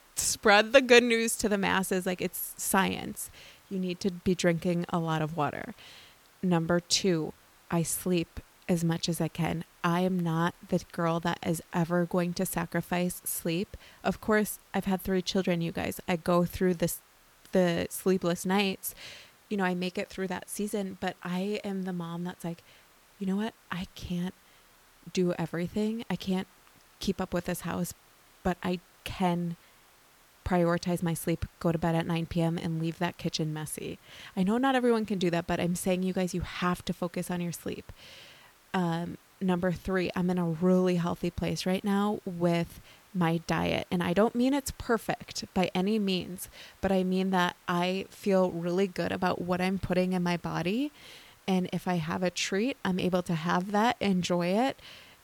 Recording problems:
hiss; faint; throughout; 30 dB below the speech

